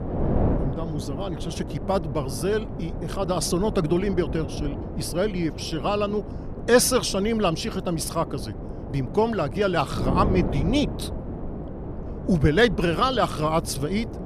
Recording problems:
wind noise on the microphone; occasional gusts; 10 dB below the speech

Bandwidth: 14.5 kHz